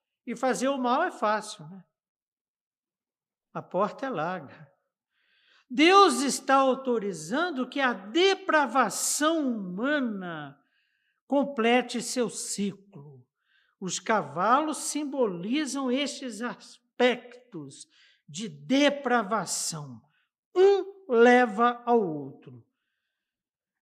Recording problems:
none

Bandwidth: 14.5 kHz